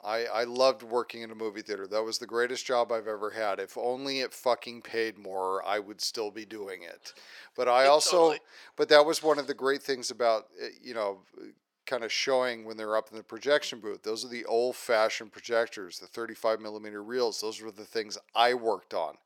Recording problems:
thin; somewhat; fading below 500 Hz

